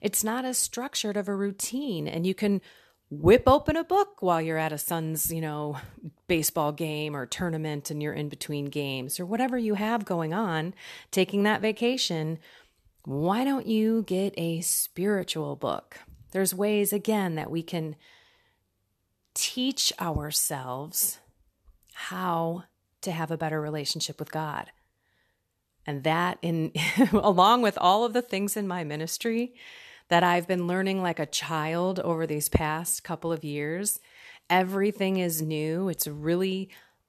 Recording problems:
none

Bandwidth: 13.5 kHz